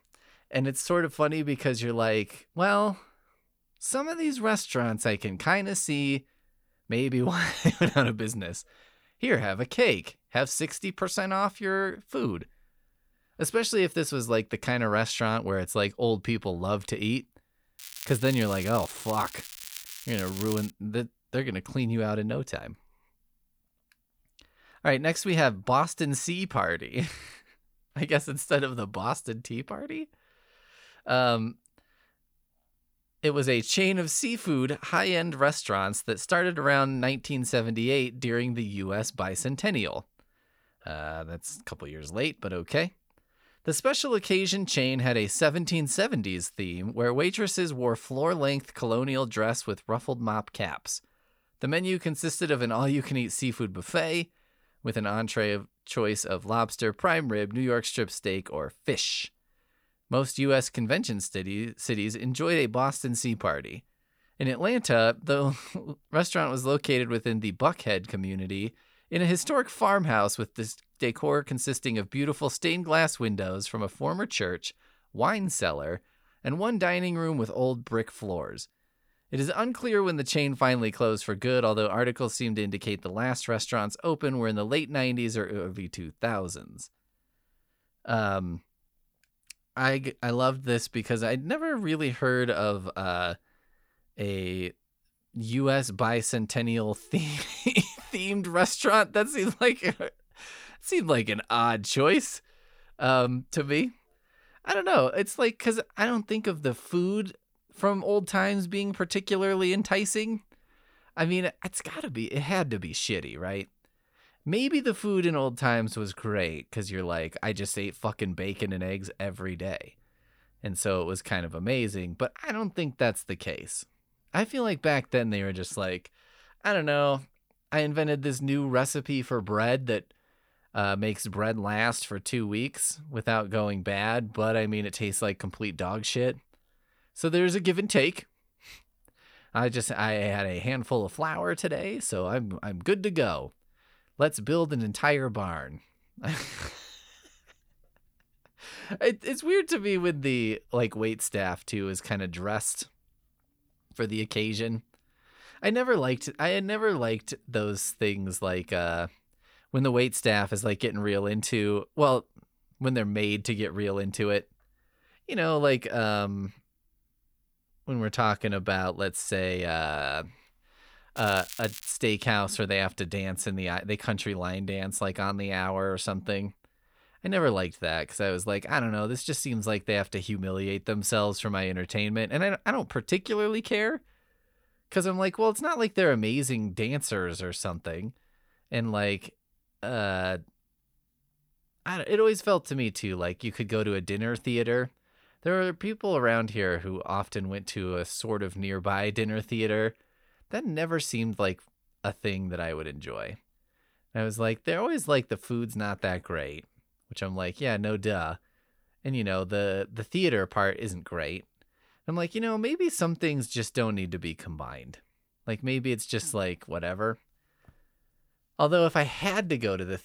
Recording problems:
crackling; noticeable; from 18 to 21 s and at 2:51; 10 dB below the speech

